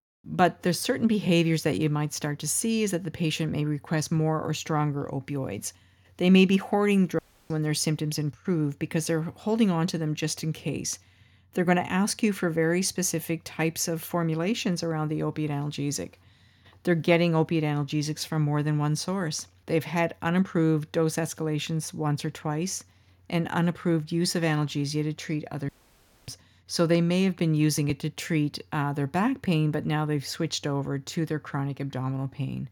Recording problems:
audio cutting out; at 7 s and at 26 s for 0.5 s

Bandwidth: 18 kHz